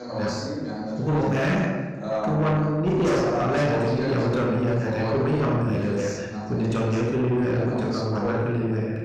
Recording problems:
off-mic speech; far
room echo; noticeable; dies away in 1.1 s
distortion; slight; 10 dB below the speech
voice in the background; loud; throughout; 6 dB below the speech

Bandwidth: 15.5 kHz